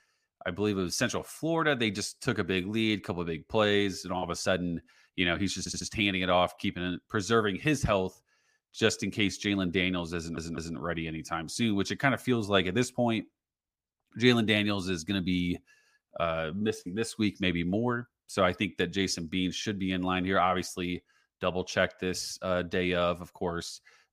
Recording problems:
audio stuttering; at 5.5 s and at 10 s

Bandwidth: 15 kHz